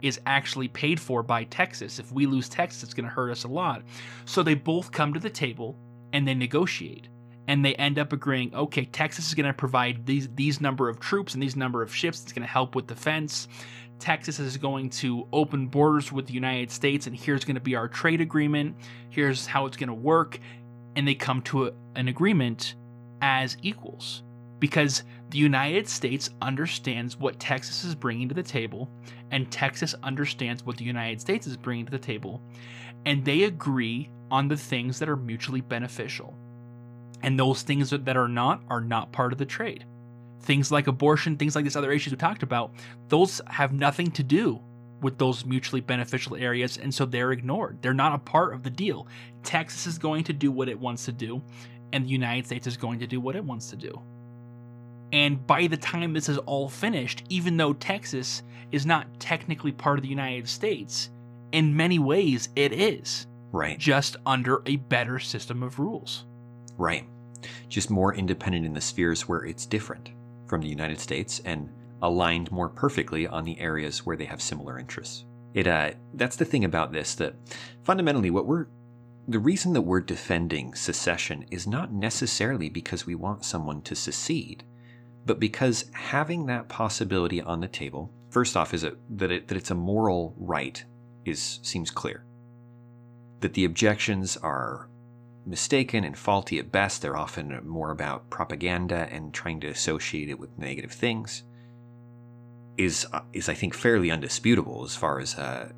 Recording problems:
electrical hum; faint; throughout; 60 Hz, 25 dB below the speech

